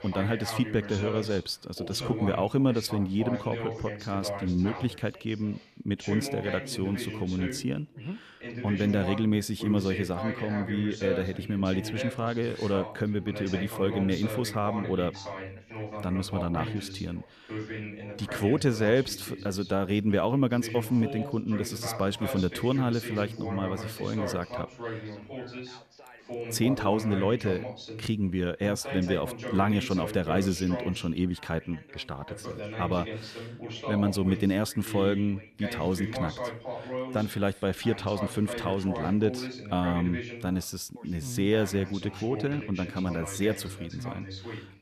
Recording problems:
background chatter; loud; throughout; 2 voices, 8 dB below the speech

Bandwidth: 14 kHz